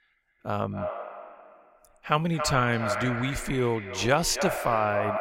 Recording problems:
echo of what is said; strong; throughout; 280 ms later, 7 dB below the speech

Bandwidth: 16 kHz